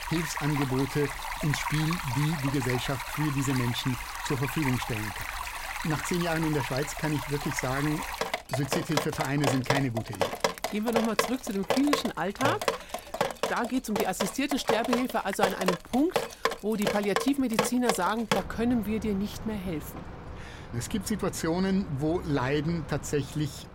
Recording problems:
rain or running water; loud; throughout; 3 dB below the speech

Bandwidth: 16 kHz